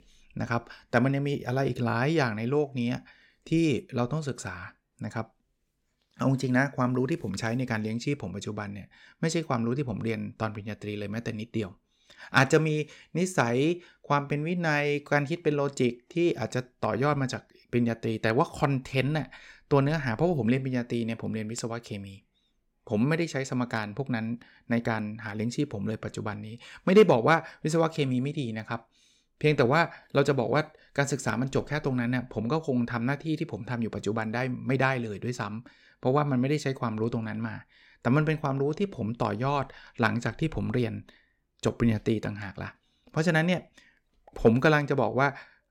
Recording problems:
none

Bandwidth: 17 kHz